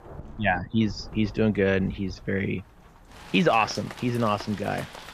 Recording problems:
rain or running water; noticeable; throughout; 15 dB below the speech

